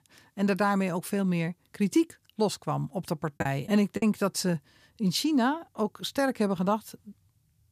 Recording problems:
choppy; very; at 3.5 s; 10% of the speech affected

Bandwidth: 14.5 kHz